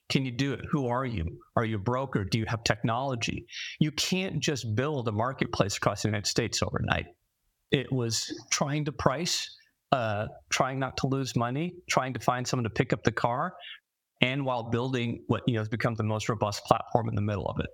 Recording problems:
squashed, flat; somewhat

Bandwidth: 17.5 kHz